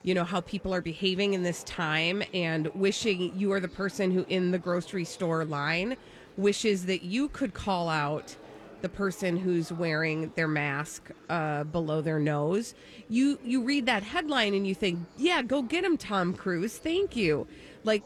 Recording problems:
murmuring crowd; faint; throughout; 20 dB below the speech

